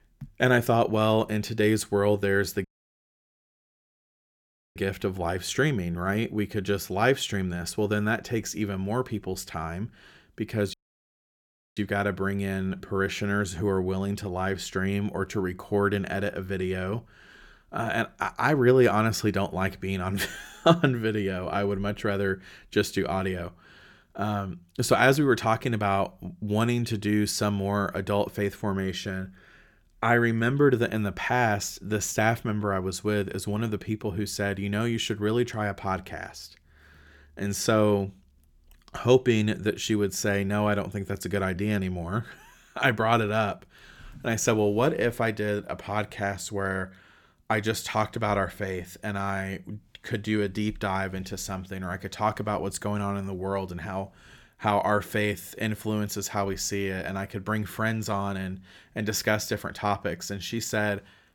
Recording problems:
audio cutting out; at 2.5 s for 2 s and at 11 s for 1 s

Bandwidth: 17.5 kHz